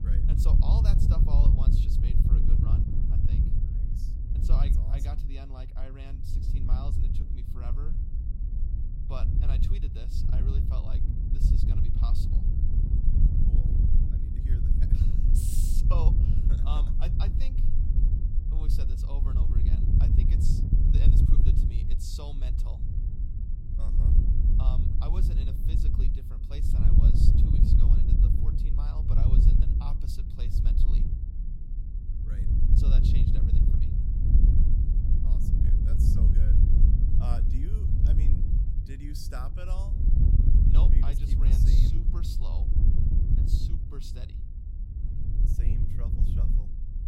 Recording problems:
wind noise on the microphone; heavy; 3 dB above the speech

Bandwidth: 16 kHz